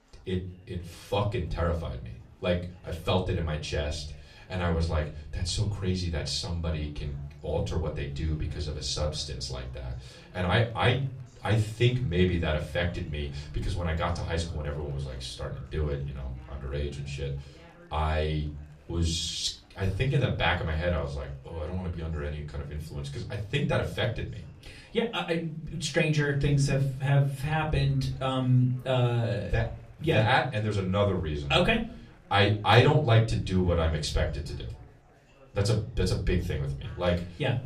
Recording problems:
off-mic speech; far
room echo; very slight; dies away in 0.4 s
chatter from many people; faint; throughout; 30 dB below the speech

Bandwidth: 14.5 kHz